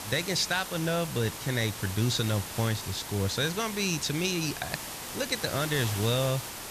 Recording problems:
hiss; loud; throughout; 7 dB below the speech

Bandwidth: 14.5 kHz